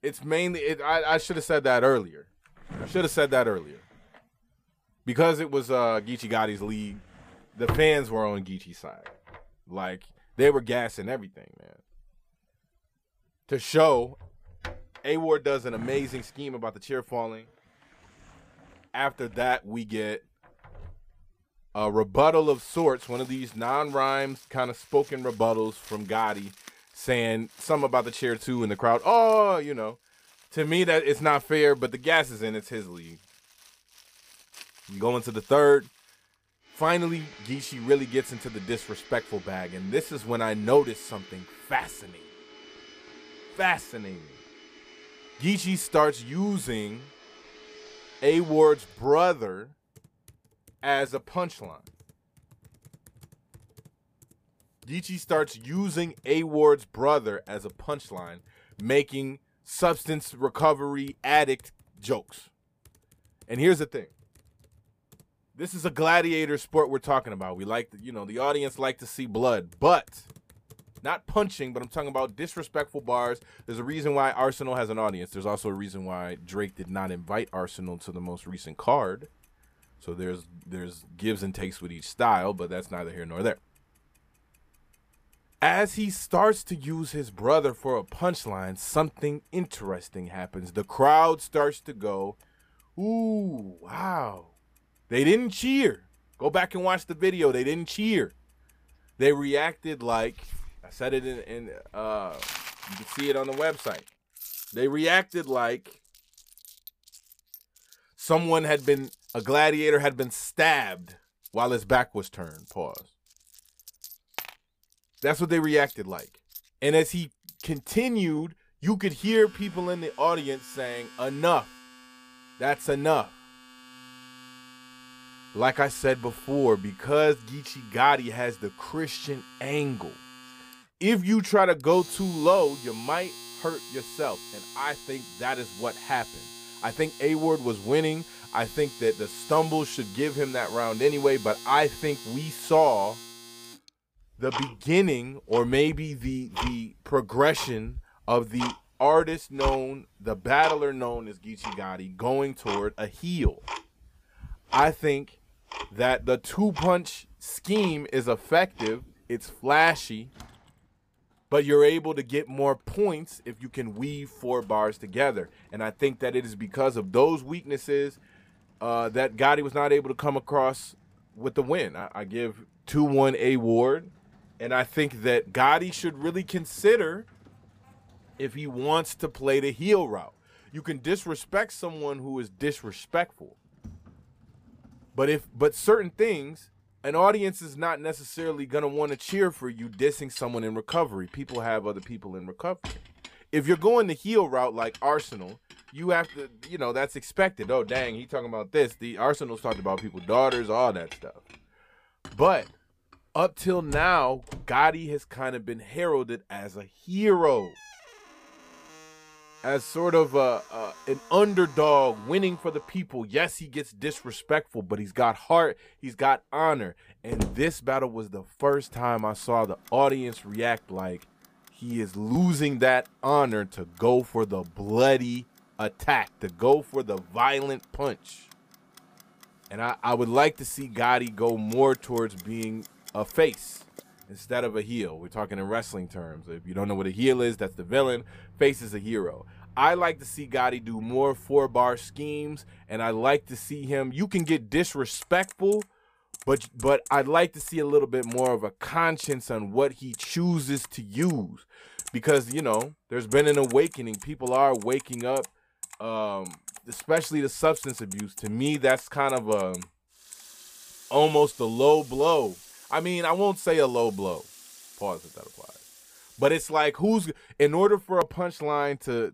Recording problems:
household noises; noticeable; throughout; 15 dB below the speech

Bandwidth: 15 kHz